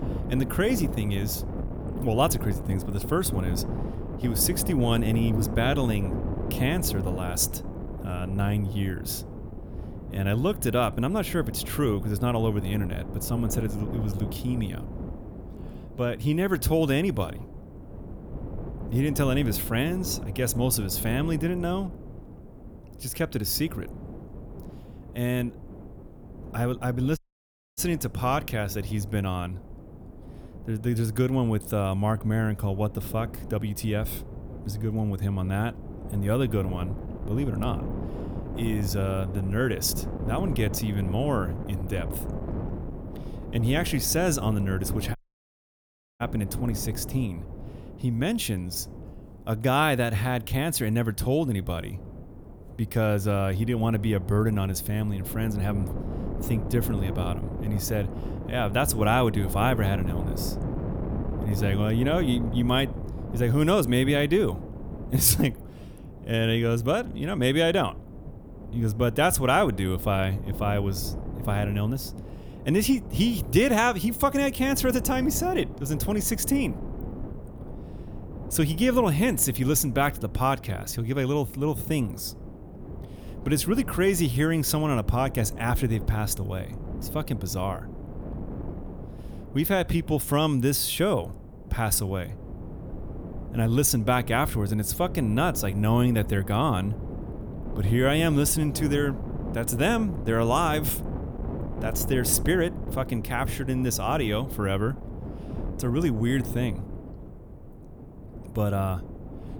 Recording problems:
wind noise on the microphone; occasional gusts; 15 dB below the speech
audio cutting out; at 27 s for 0.5 s and at 45 s for 1 s

